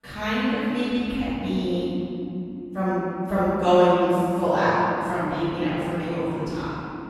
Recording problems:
room echo; strong; dies away in 3 s
off-mic speech; far

